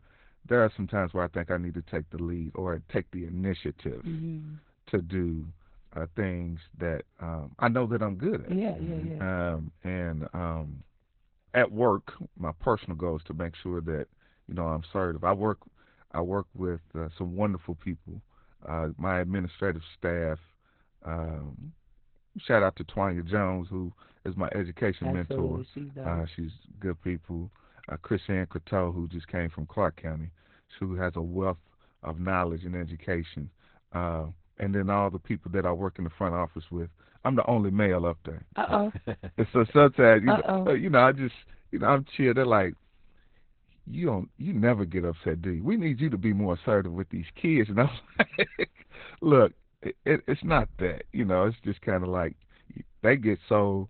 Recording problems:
garbled, watery; badly; nothing above 4 kHz

